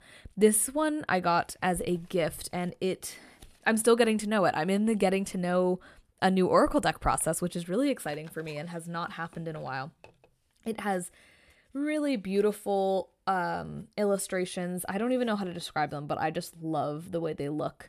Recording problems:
none

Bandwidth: 14 kHz